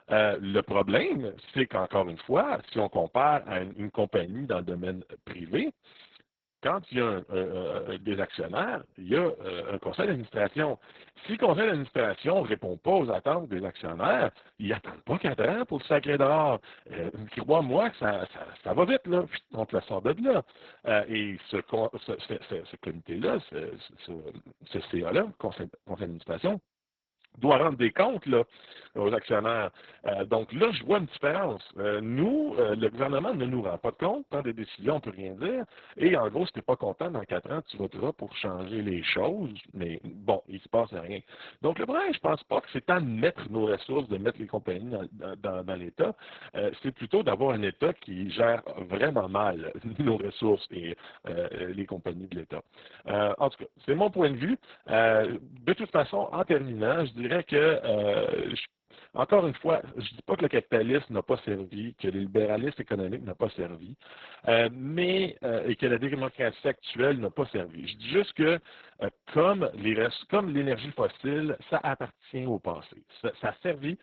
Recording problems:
garbled, watery; badly; nothing above 4 kHz

